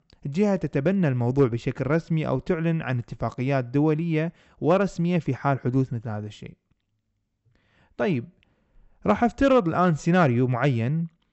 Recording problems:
high frequencies cut off; noticeable; nothing above 8 kHz

